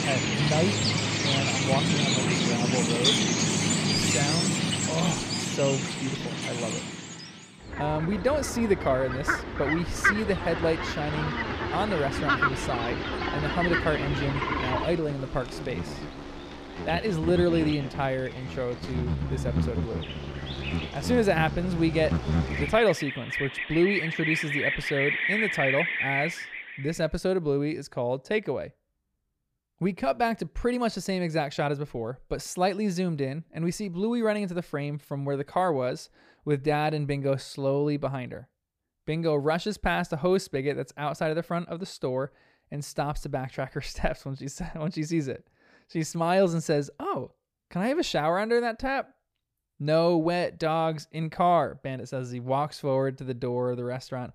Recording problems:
animal sounds; very loud; until 26 s; 1 dB above the speech

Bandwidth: 15 kHz